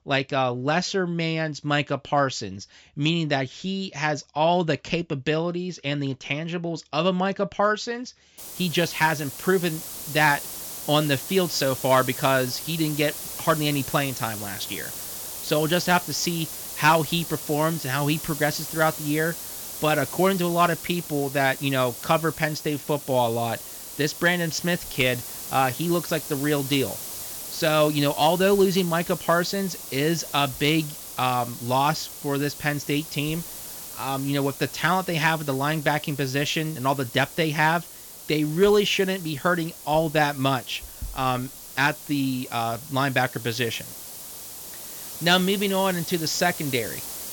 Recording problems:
high frequencies cut off; noticeable; nothing above 8 kHz
hiss; loud; from 8.5 s on; 10 dB below the speech

